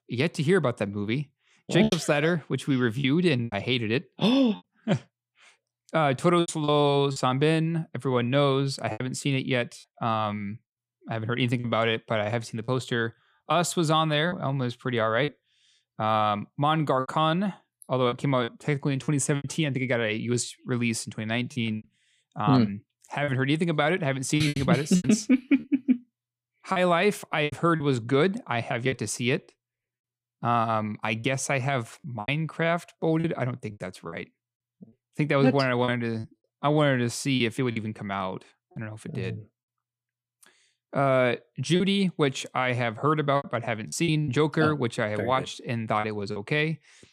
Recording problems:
choppy; very; 6% of the speech affected

